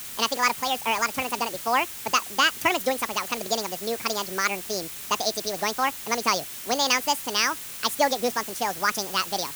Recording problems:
wrong speed and pitch; too fast and too high; 1.8 times normal speed
hiss; loud; throughout; 9 dB below the speech

